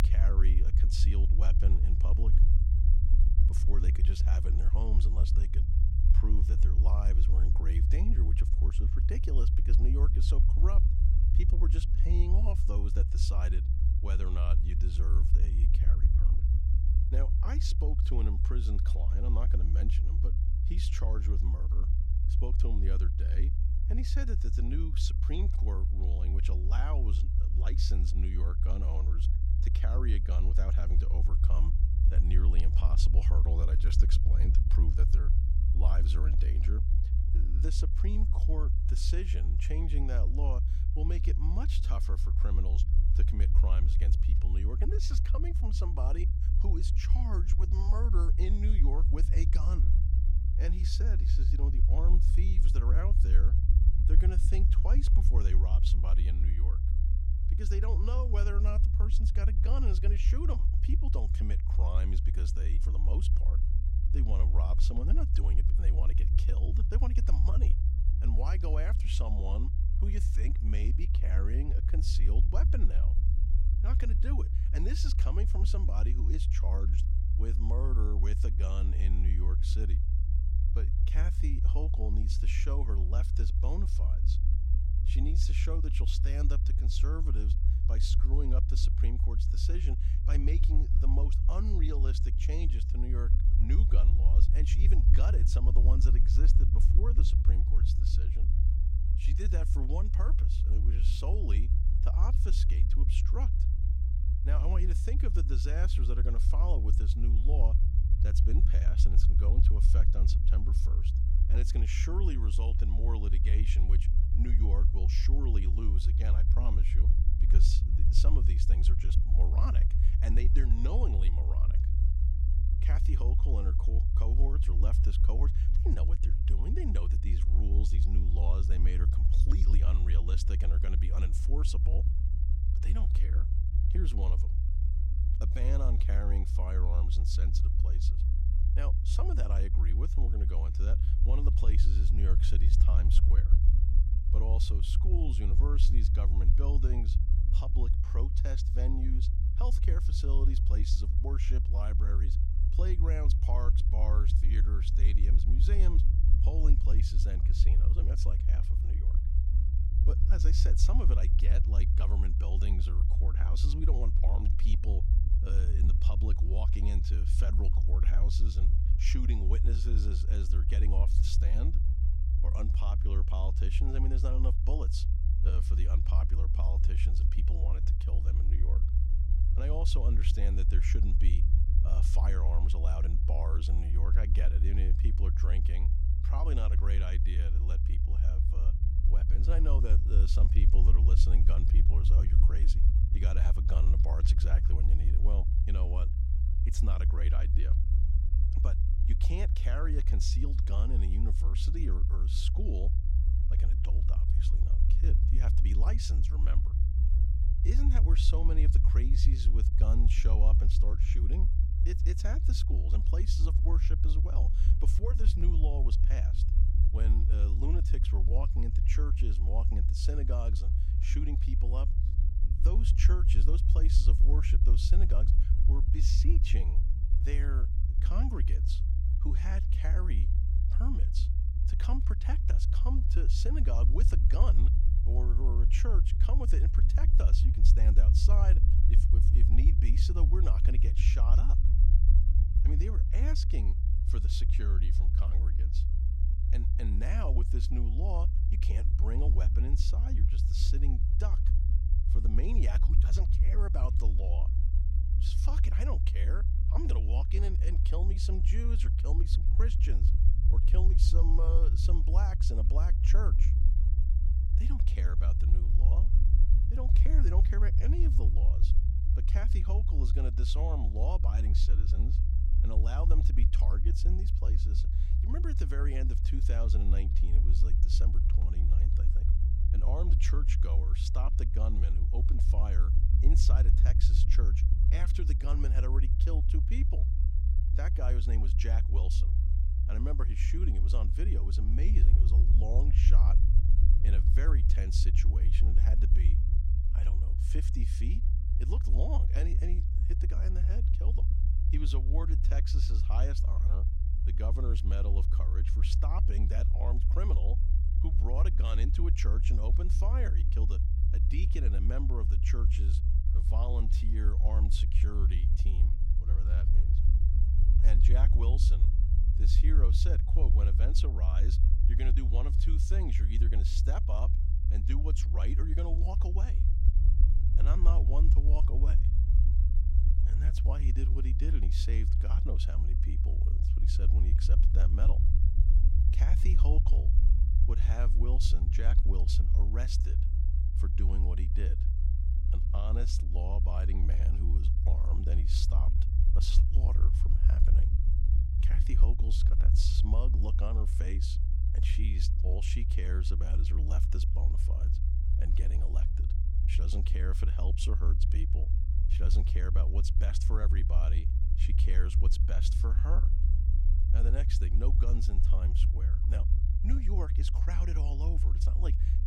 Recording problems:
low rumble; loud; throughout; 3 dB below the speech

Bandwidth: 16 kHz